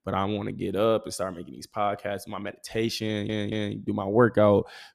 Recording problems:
audio stuttering; at 3 s

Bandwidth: 14.5 kHz